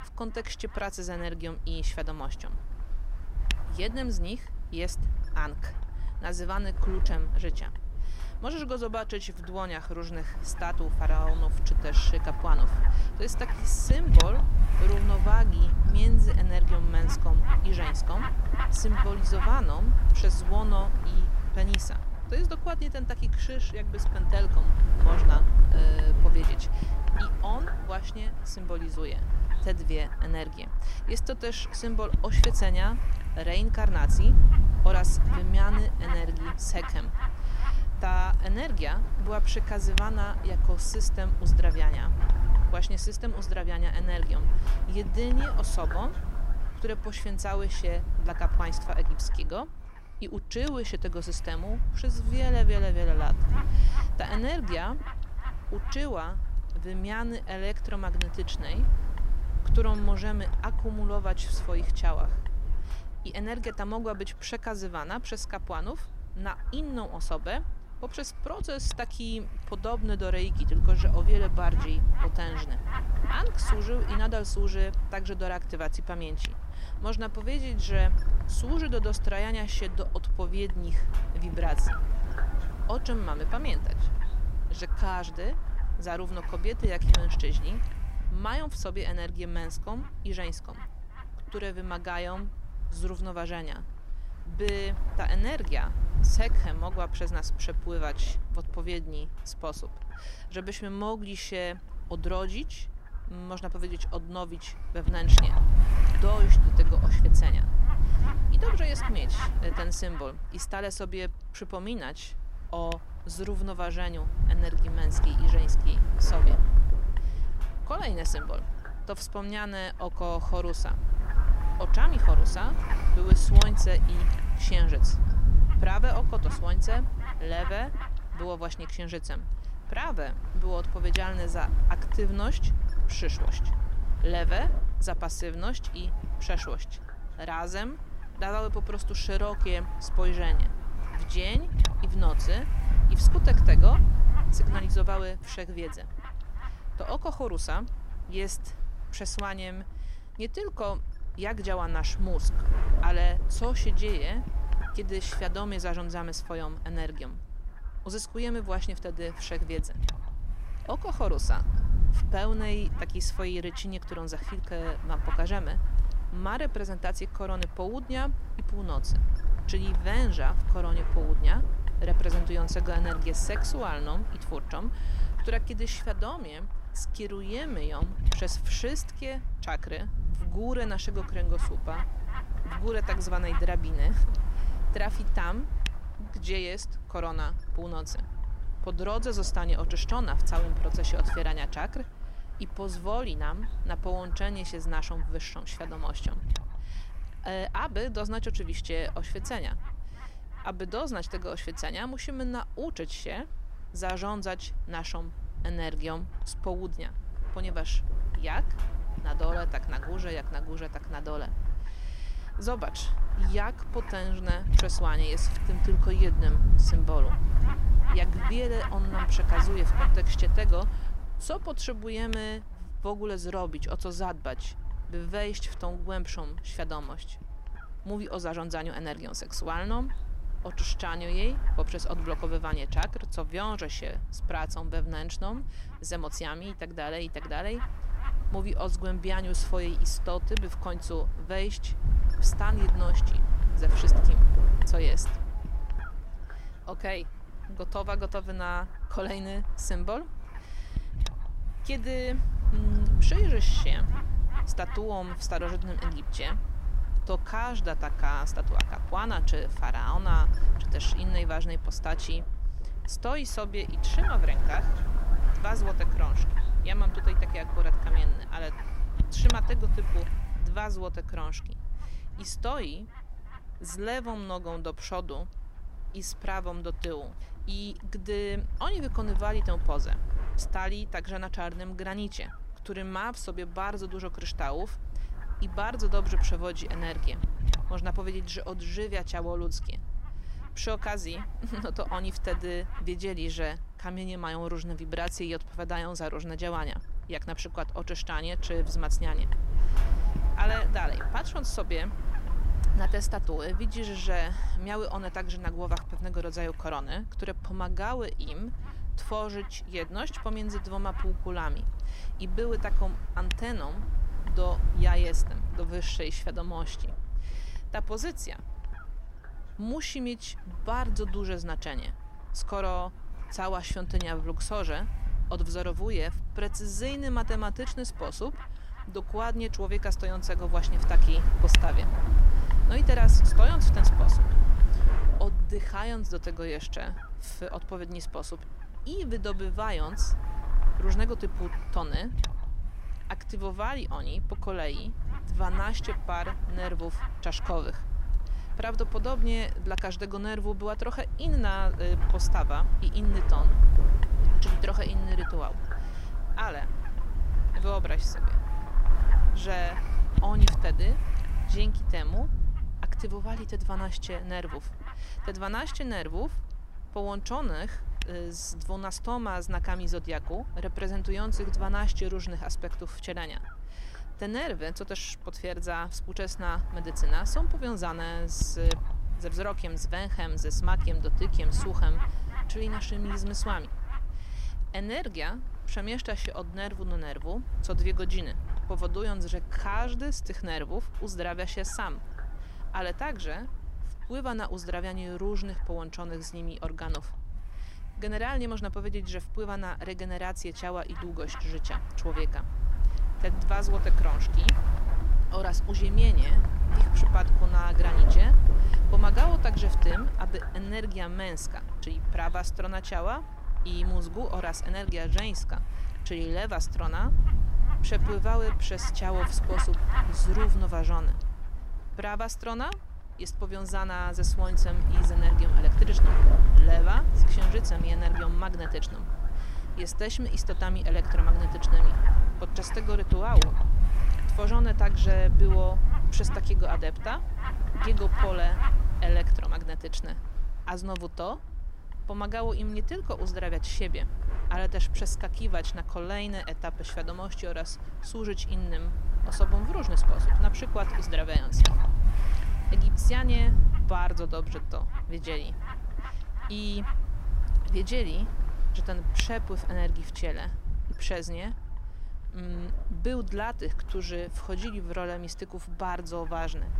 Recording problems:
wind noise on the microphone; heavy; 6 dB below the speech

